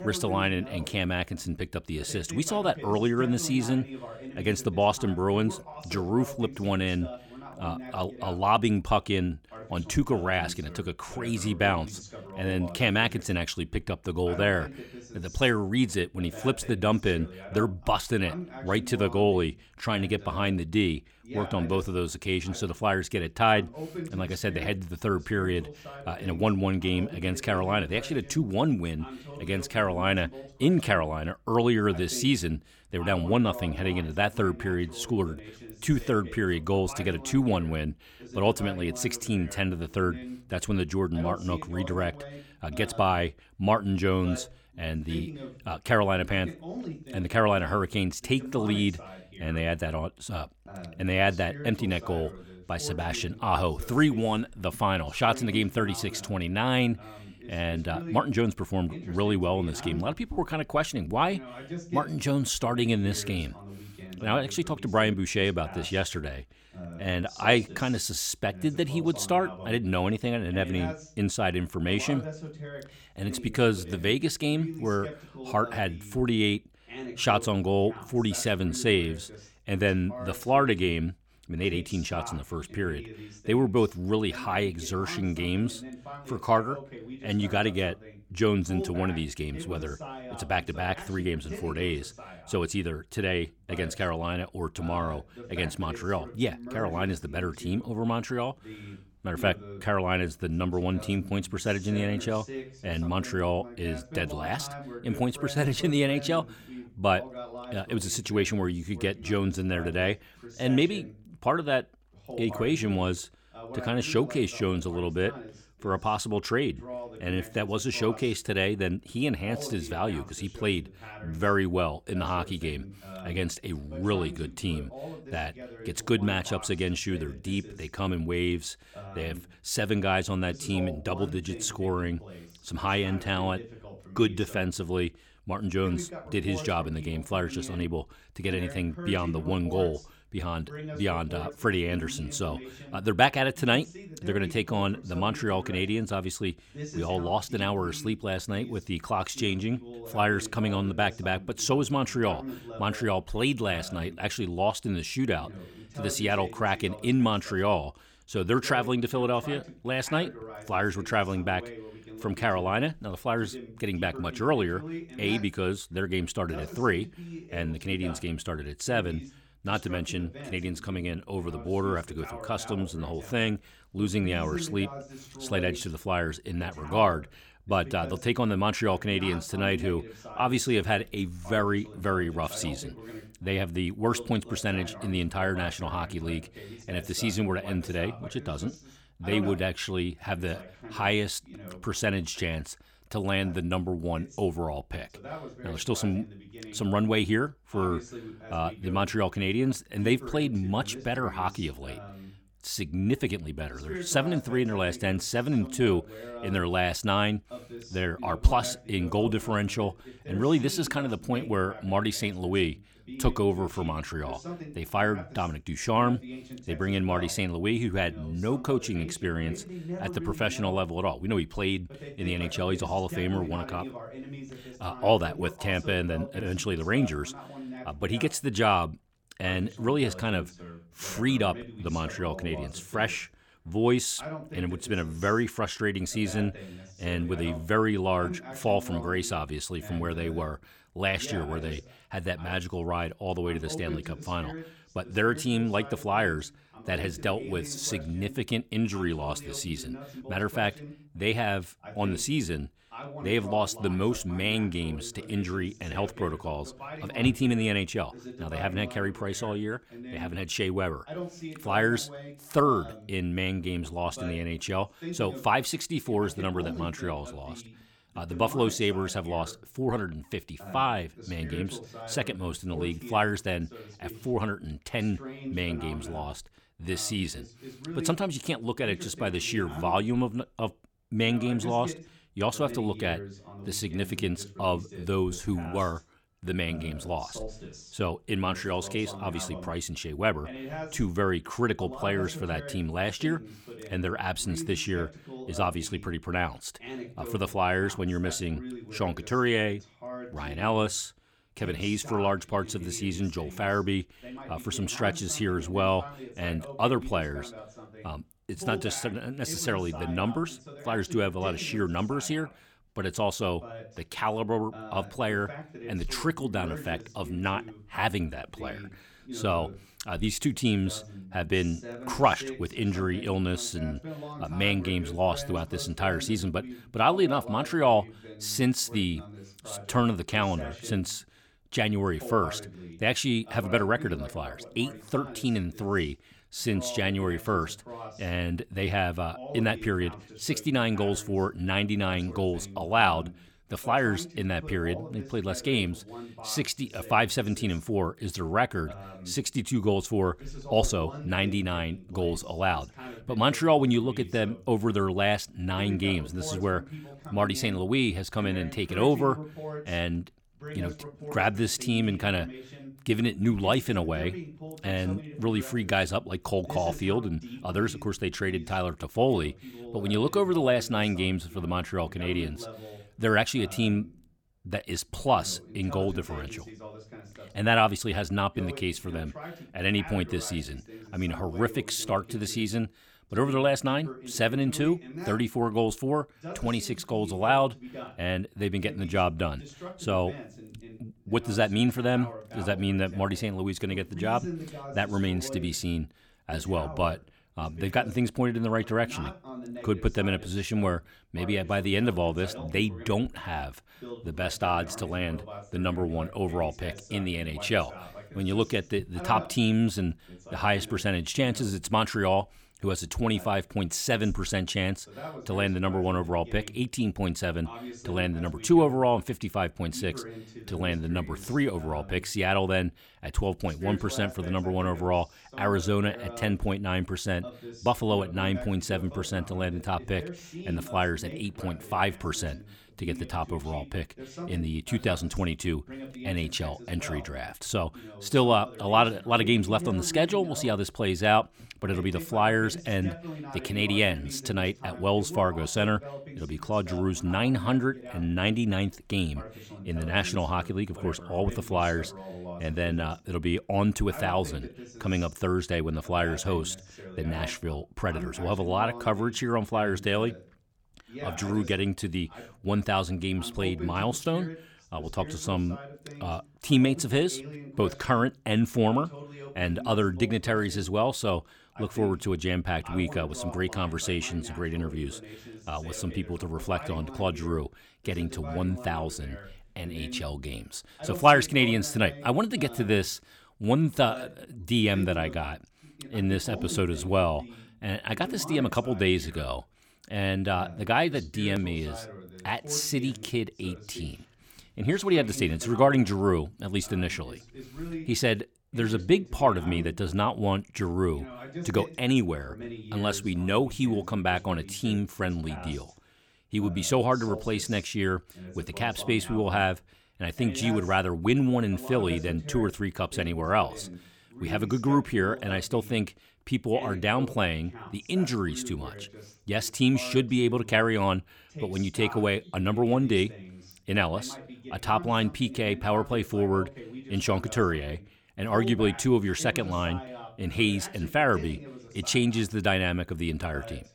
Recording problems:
voice in the background; noticeable; throughout; 15 dB below the speech

